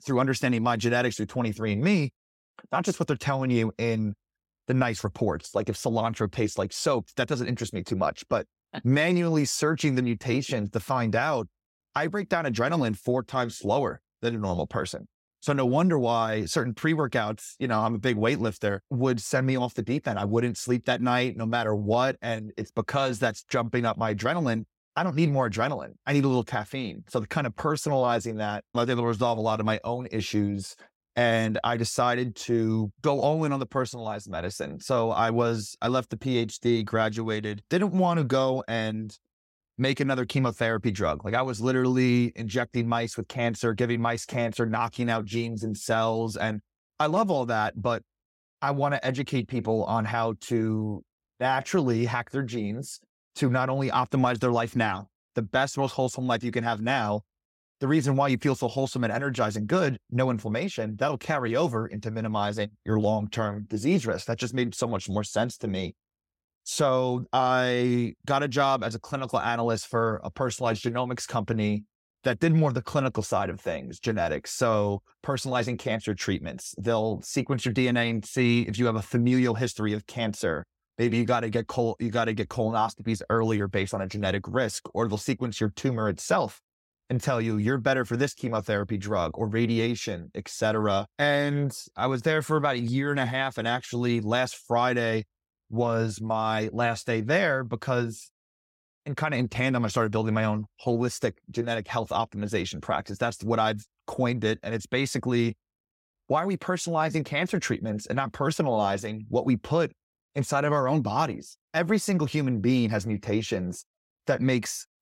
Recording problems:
none

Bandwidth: 16 kHz